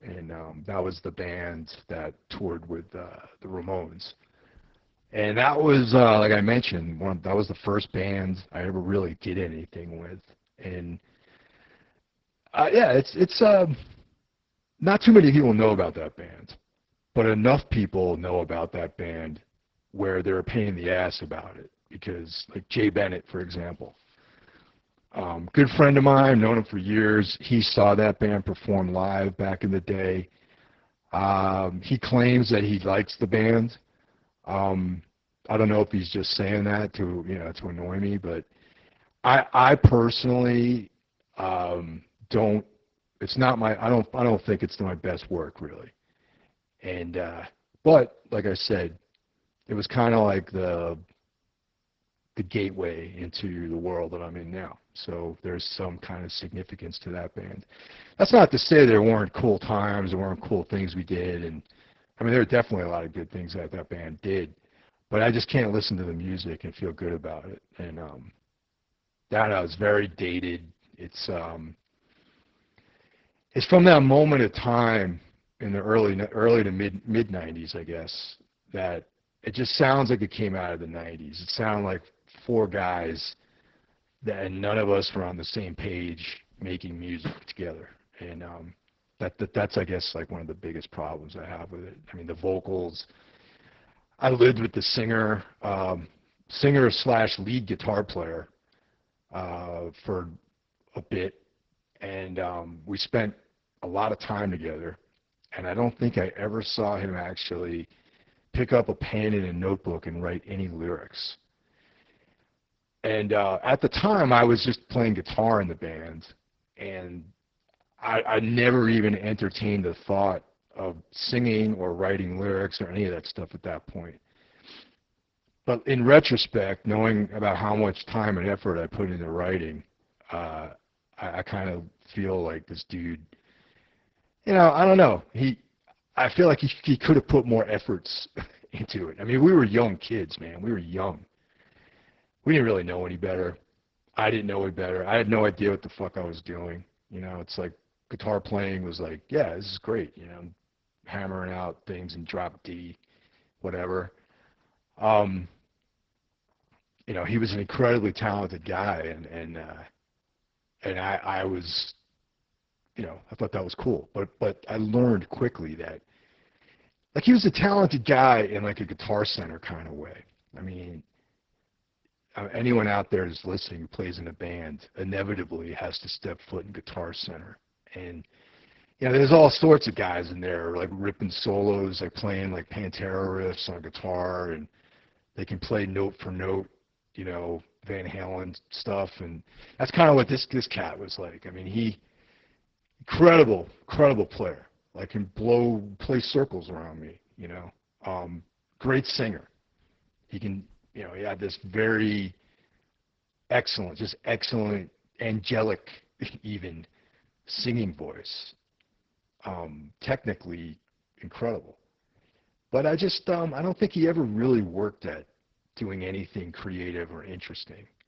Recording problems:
garbled, watery; badly; nothing above 5.5 kHz

